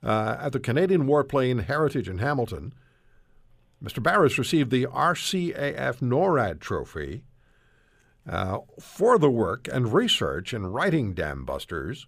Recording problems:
none

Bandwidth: 15 kHz